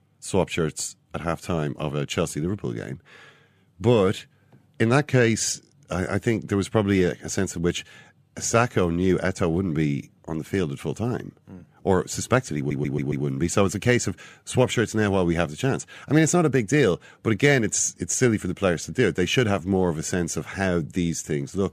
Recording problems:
audio stuttering; at 13 s

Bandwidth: 14.5 kHz